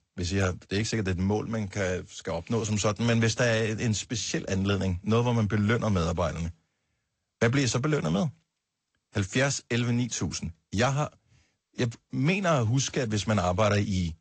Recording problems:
garbled, watery; slightly; nothing above 7.5 kHz

